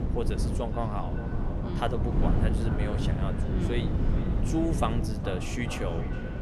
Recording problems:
echo of what is said; strong; throughout; 420 ms later, 10 dB below the speech
wind noise on the microphone; heavy; 4 dB below the speech

